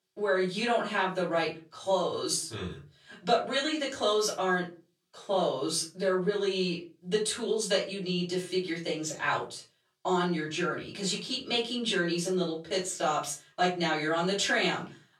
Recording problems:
off-mic speech; far
thin; somewhat; fading below 350 Hz
room echo; slight; dies away in 0.3 s

